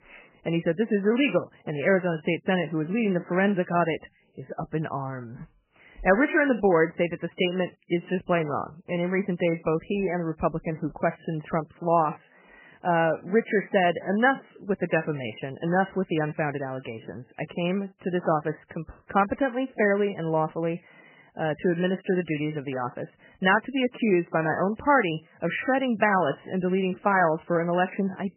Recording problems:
garbled, watery; badly; nothing above 3 kHz

